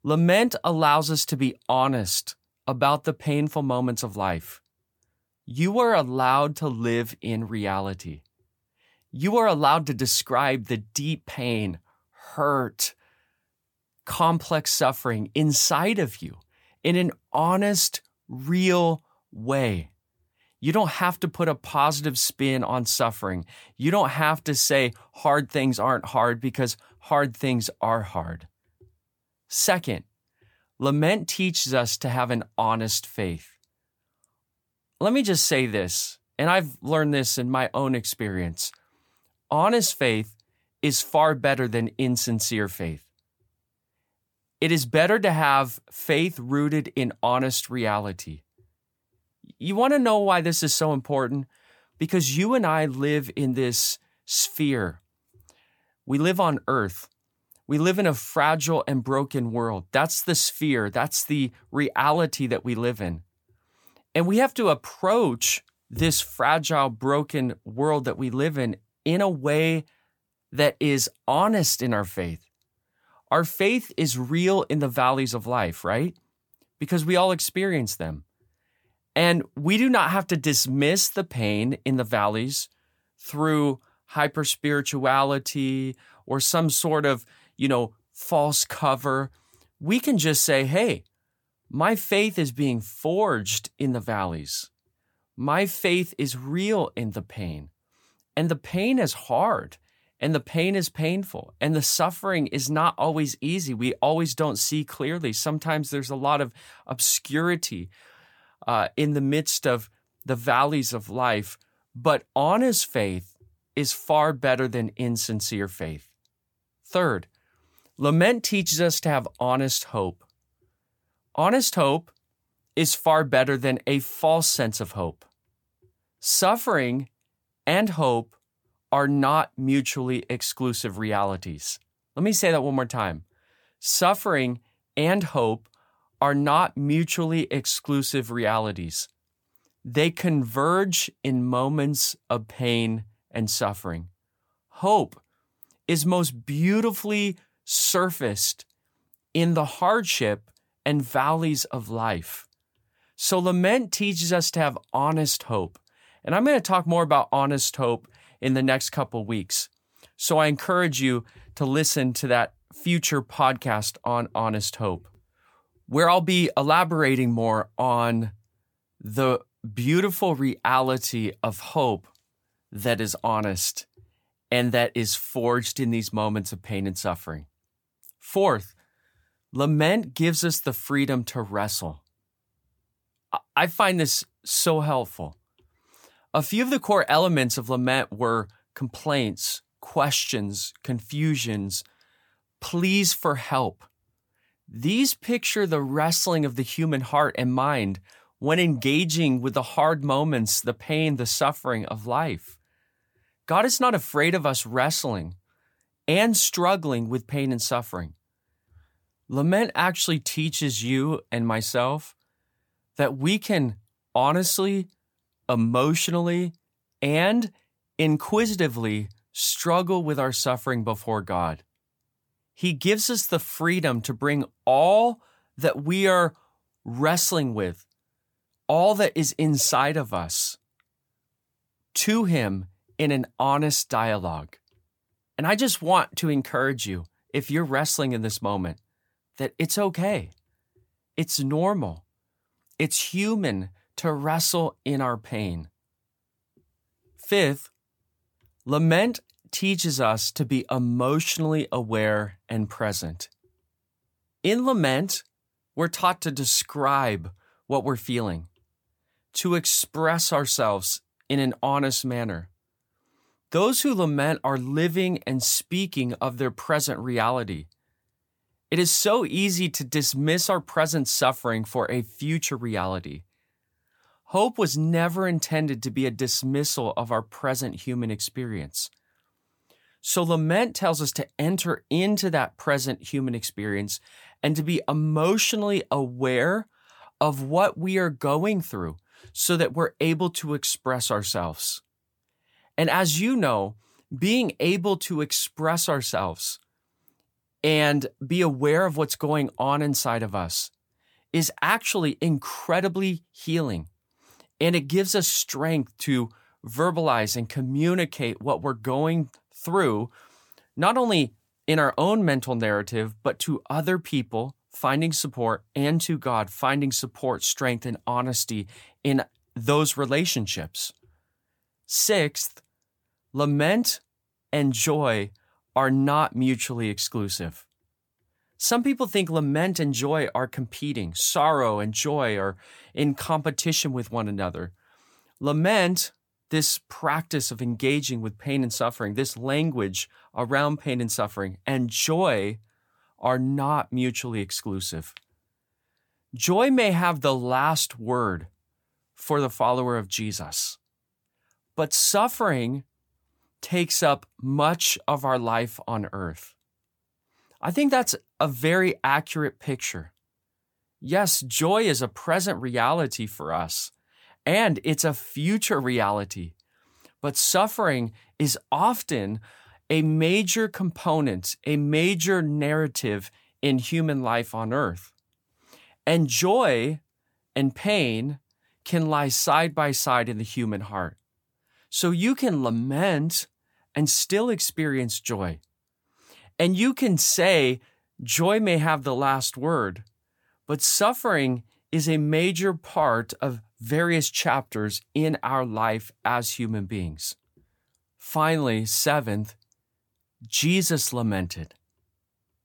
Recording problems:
none

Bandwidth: 18.5 kHz